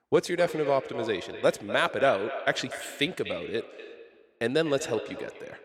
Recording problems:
echo of what is said; strong; throughout; 240 ms later, 10 dB below the speech

